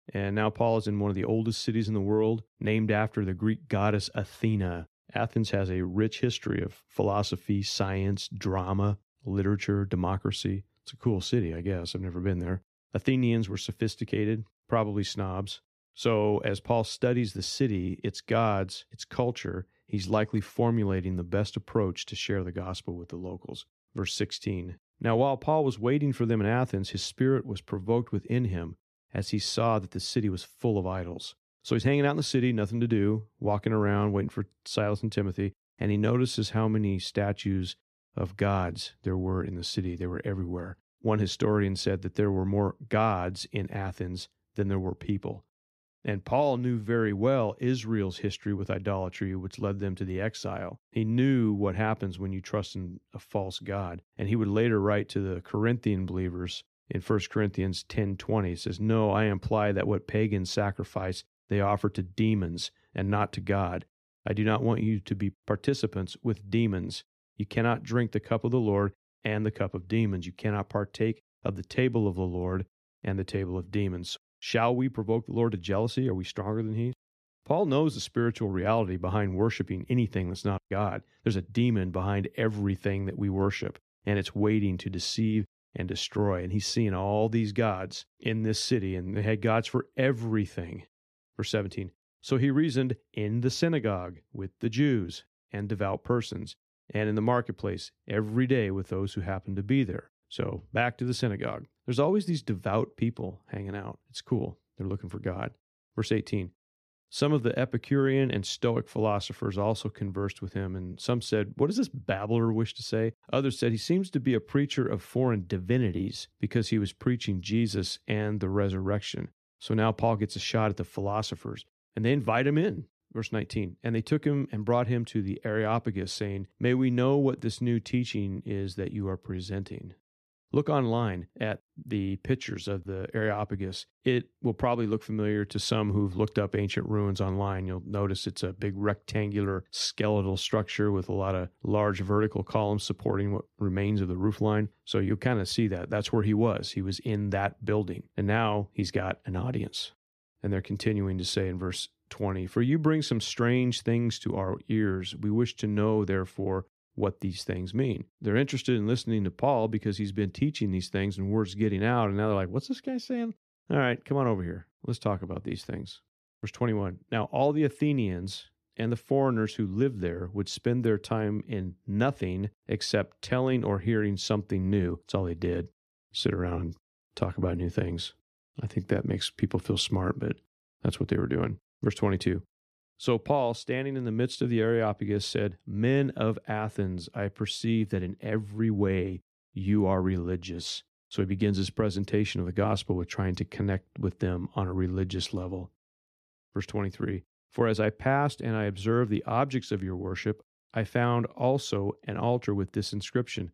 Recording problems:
none

